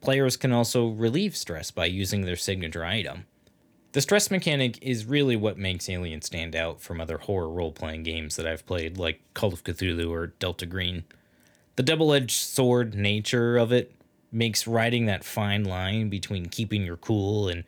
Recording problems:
none

